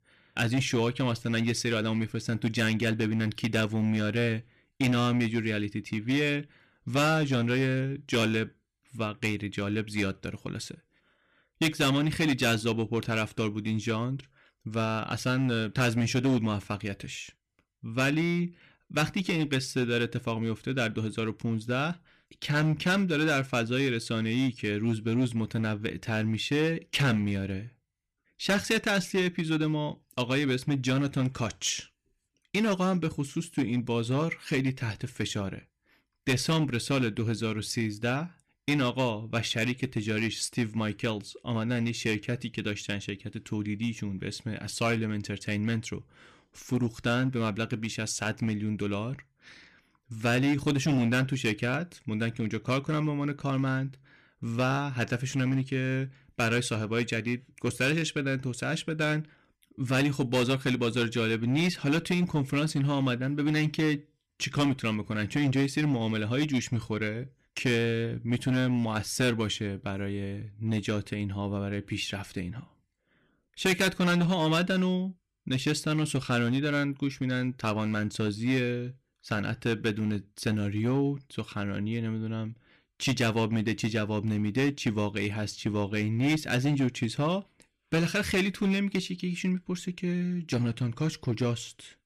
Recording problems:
distortion; slight; 6% of the sound clipped

